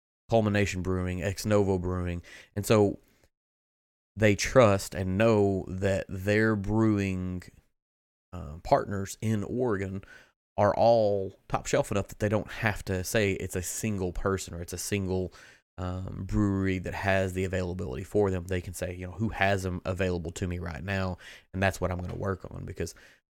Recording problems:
none

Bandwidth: 16.5 kHz